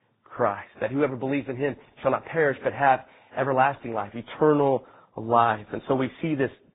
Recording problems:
garbled, watery; badly; nothing above 3.5 kHz
high frequencies cut off; slight

